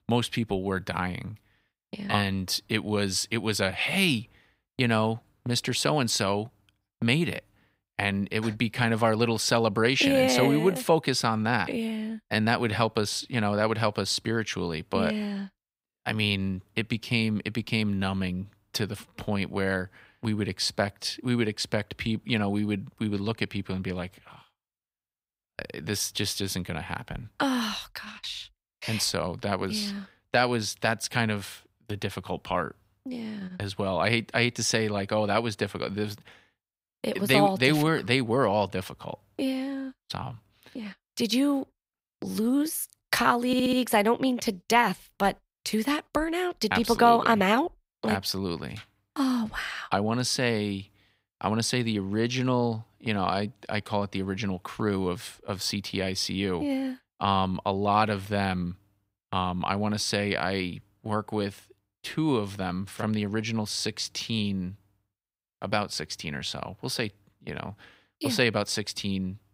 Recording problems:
audio stuttering; at 43 s

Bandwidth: 15.5 kHz